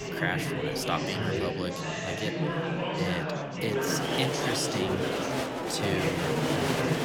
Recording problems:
murmuring crowd; very loud; throughout; 4 dB above the speech

